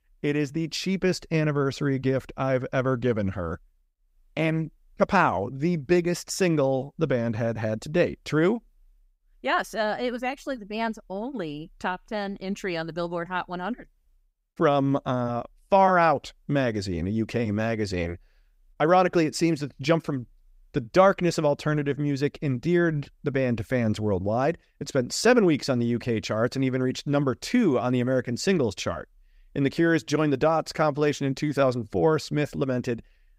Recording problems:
none

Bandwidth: 15.5 kHz